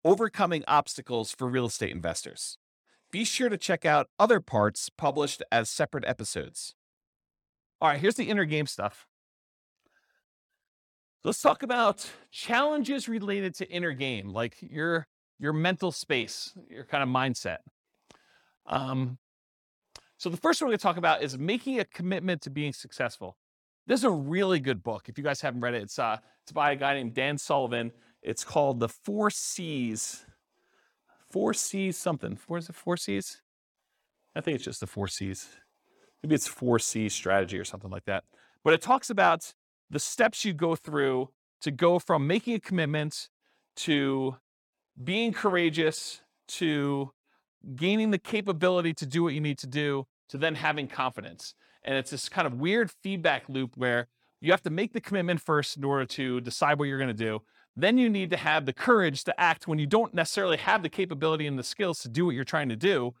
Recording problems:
none

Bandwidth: 18 kHz